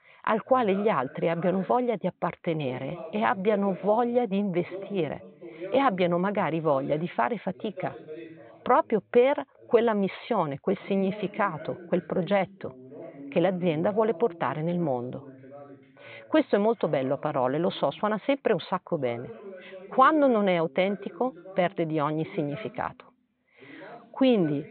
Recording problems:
high frequencies cut off; severe; nothing above 4 kHz
voice in the background; noticeable; throughout; 15 dB below the speech

